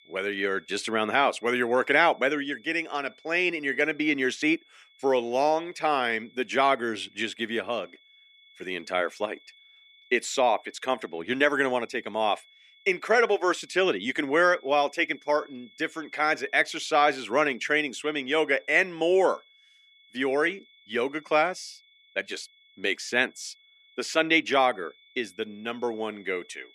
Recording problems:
thin; somewhat; fading below 300 Hz
high-pitched whine; faint; throughout; 3.5 kHz, 30 dB below the speech

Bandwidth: 14.5 kHz